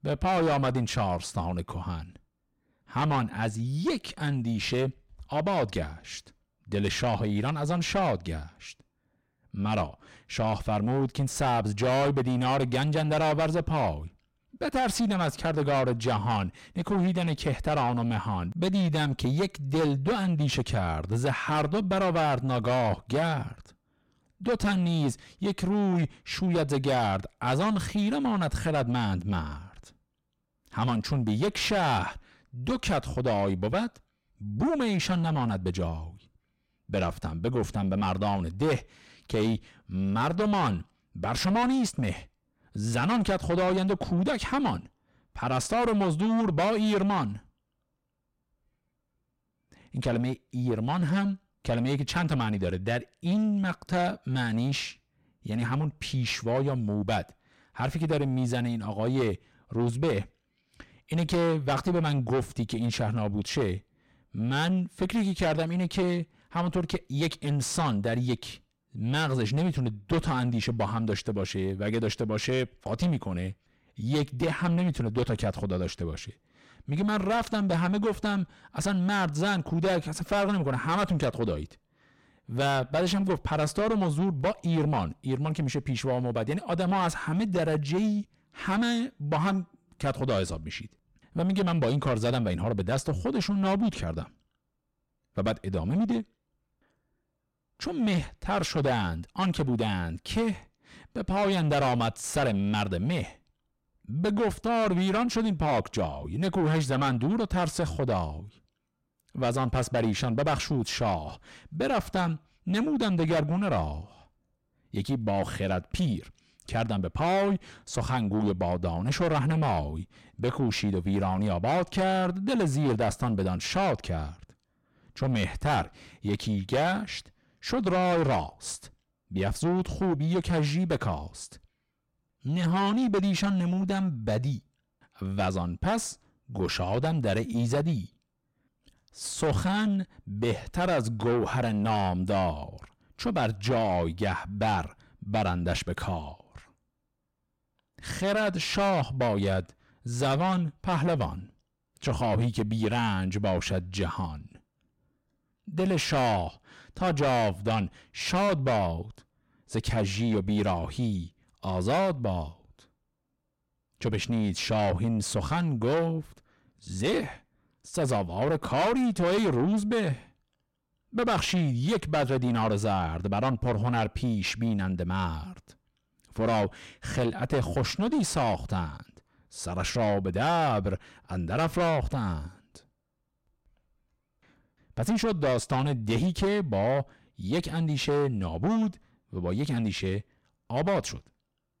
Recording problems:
distortion; heavy; 5 dB below the speech

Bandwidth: 16 kHz